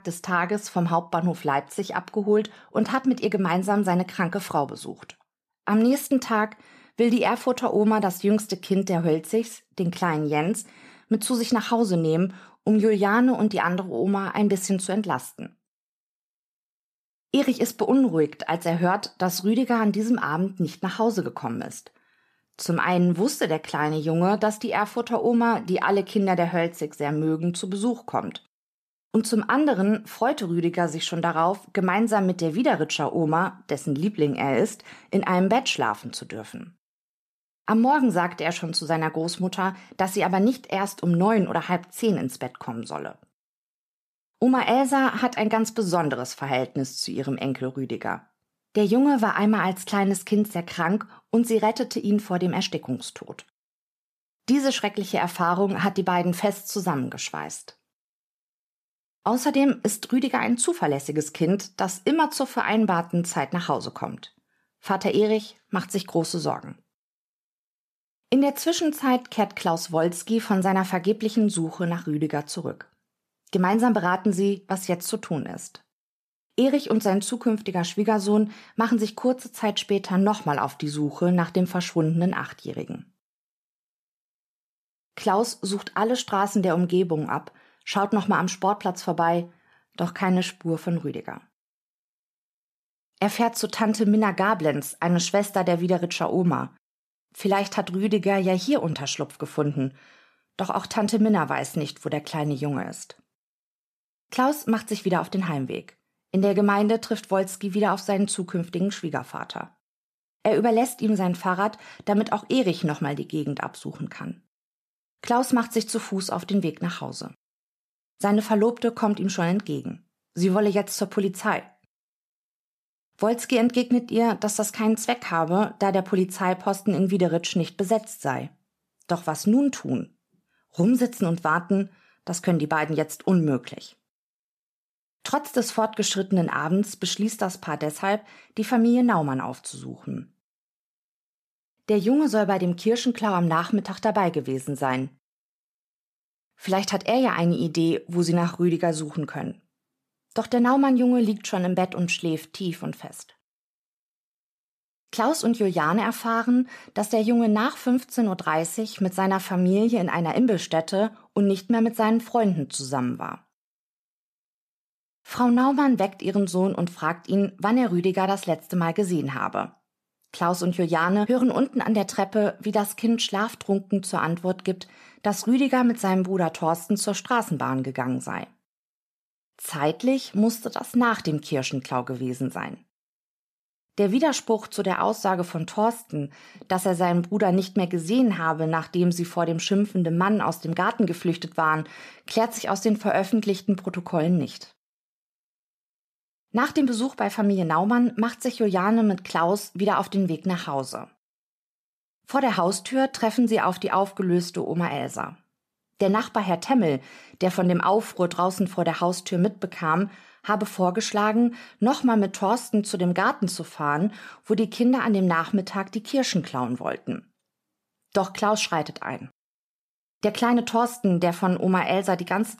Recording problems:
none

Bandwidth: 14.5 kHz